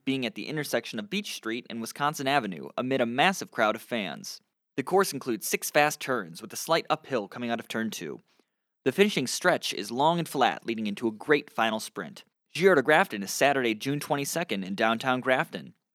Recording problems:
none

